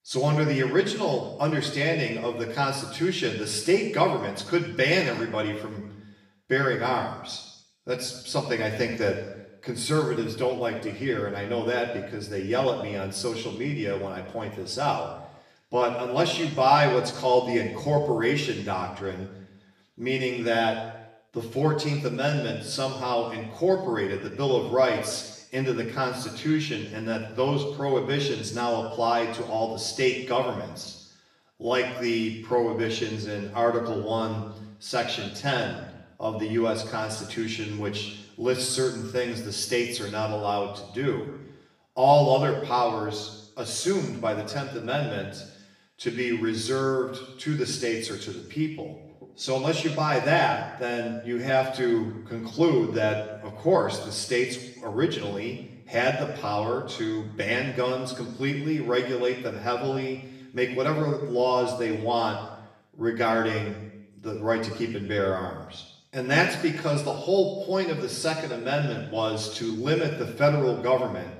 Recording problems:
off-mic speech; far
room echo; noticeable; dies away in 0.9 s

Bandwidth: 15 kHz